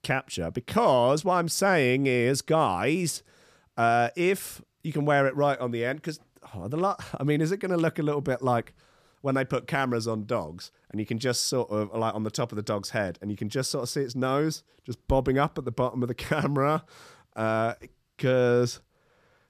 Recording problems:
none

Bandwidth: 15 kHz